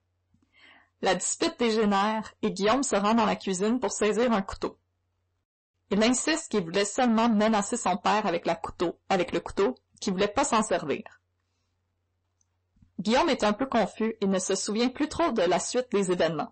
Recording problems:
distortion; heavy; 7 dB below the speech
garbled, watery; slightly; nothing above 8 kHz

